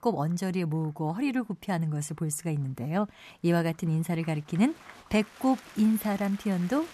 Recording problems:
crowd noise; noticeable; throughout; 20 dB below the speech

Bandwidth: 14 kHz